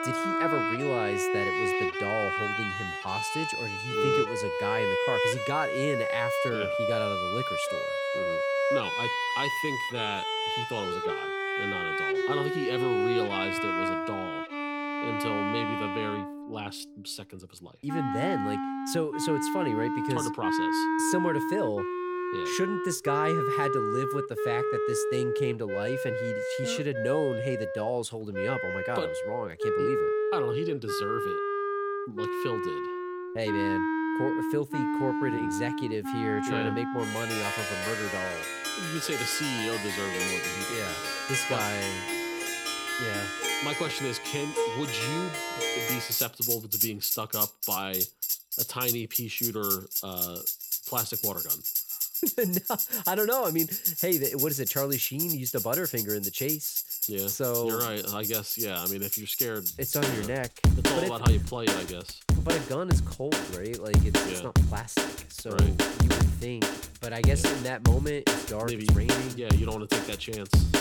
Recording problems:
background music; very loud; throughout; 4 dB above the speech

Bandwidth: 17.5 kHz